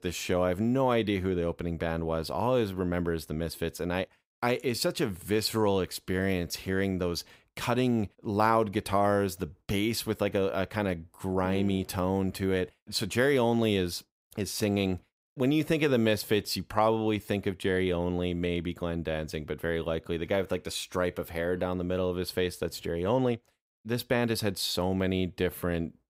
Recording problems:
none

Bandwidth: 15.5 kHz